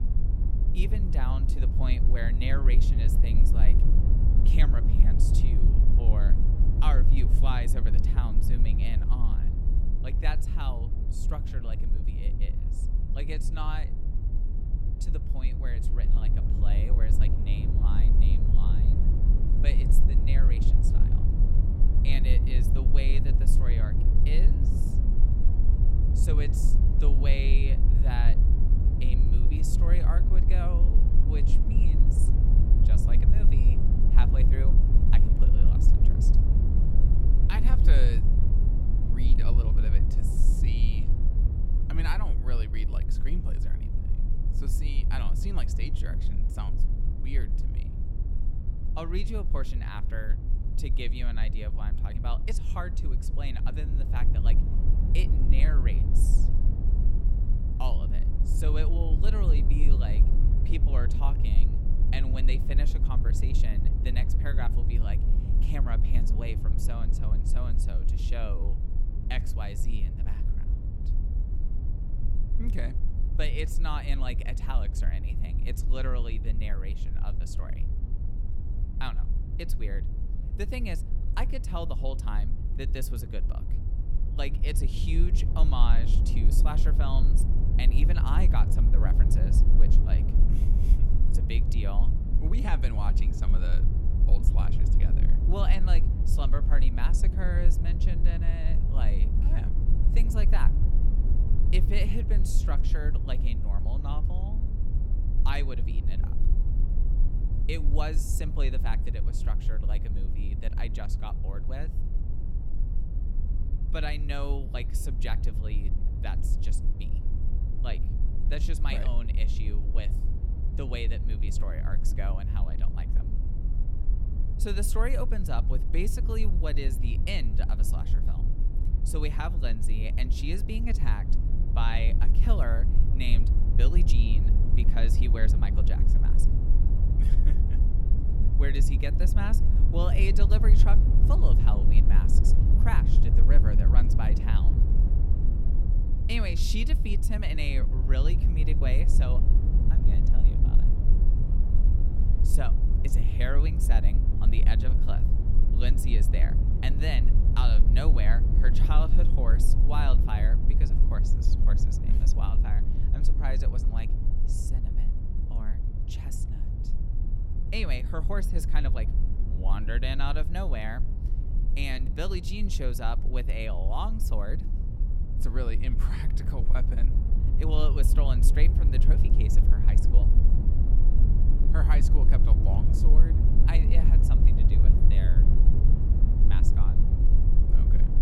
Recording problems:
low rumble; loud; throughout; 5 dB below the speech

